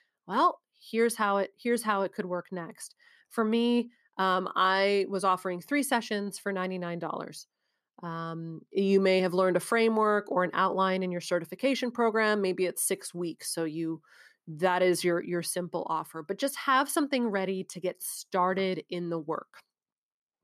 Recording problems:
none

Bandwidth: 14 kHz